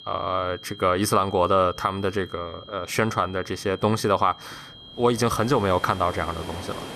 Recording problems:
high-pitched whine; noticeable; throughout; 3 kHz, 20 dB below the speech
rain or running water; noticeable; throughout; 15 dB below the speech

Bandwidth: 14 kHz